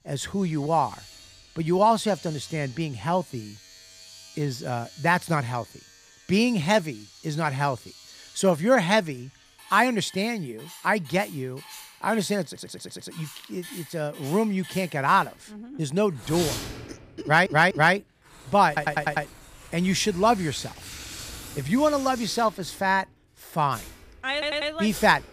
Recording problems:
household noises; noticeable; throughout; 15 dB below the speech
audio stuttering; 4 times, first at 12 s

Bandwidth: 15 kHz